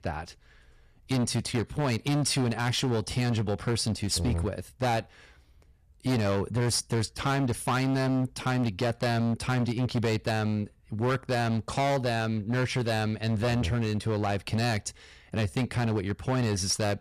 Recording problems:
distortion; heavy; 16% of the sound clipped

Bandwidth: 14.5 kHz